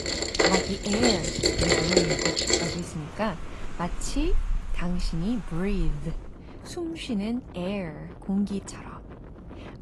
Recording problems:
garbled, watery; slightly; nothing above 11.5 kHz
rain or running water; very loud; until 6 s; 6 dB above the speech
wind noise on the microphone; occasional gusts; until 4.5 s and from 6 s on; 15 dB below the speech

